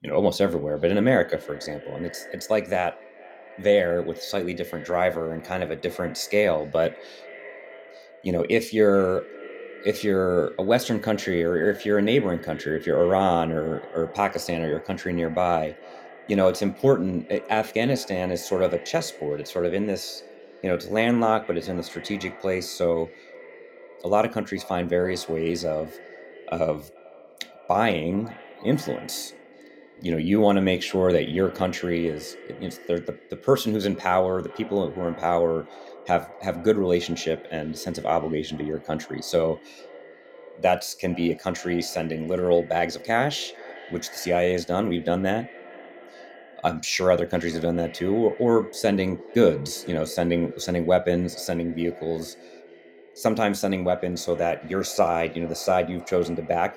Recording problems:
echo of what is said; faint; throughout; 440 ms later, 20 dB below the speech

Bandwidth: 16.5 kHz